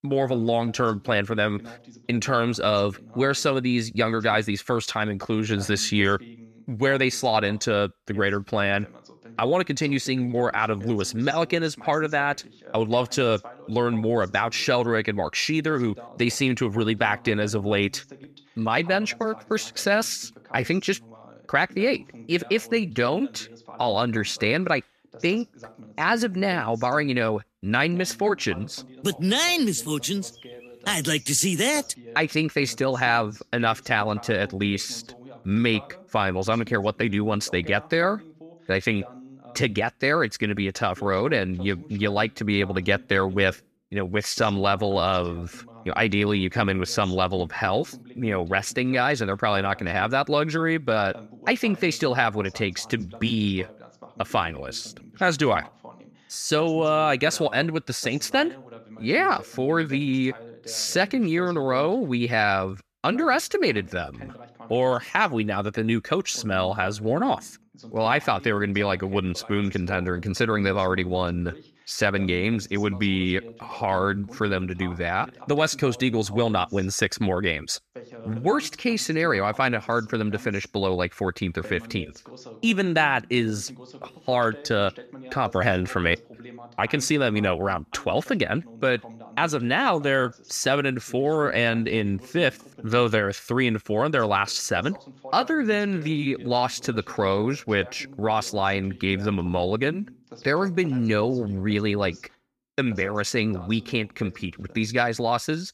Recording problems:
voice in the background; faint; throughout; 20 dB below the speech

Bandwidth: 14.5 kHz